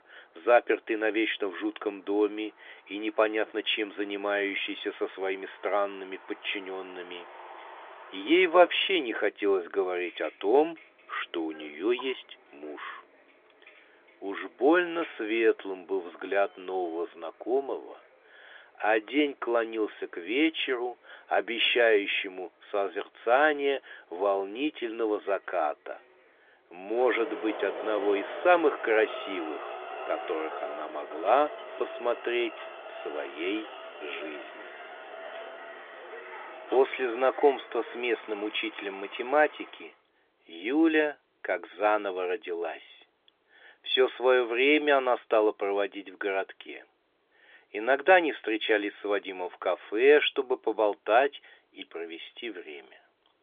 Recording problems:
phone-call audio; nothing above 3.5 kHz
traffic noise; noticeable; until 40 s; 15 dB below the speech

